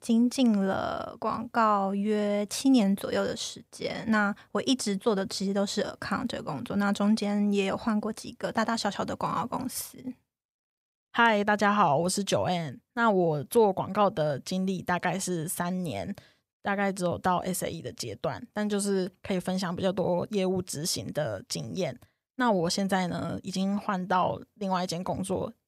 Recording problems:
none

